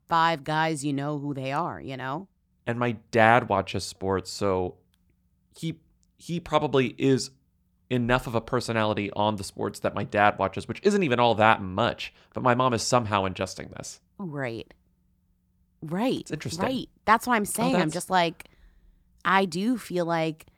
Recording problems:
none

